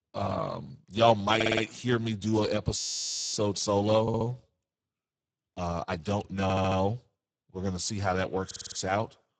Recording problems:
garbled, watery; badly; nothing above 7.5 kHz
audio stuttering; 4 times, first at 1.5 s
audio freezing; at 3 s for 0.5 s

